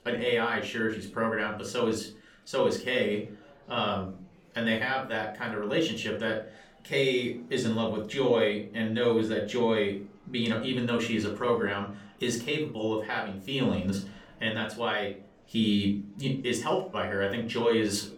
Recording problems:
room echo; slight; dies away in 0.3 s
off-mic speech; somewhat distant
murmuring crowd; faint; throughout; 30 dB below the speech

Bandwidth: 17.5 kHz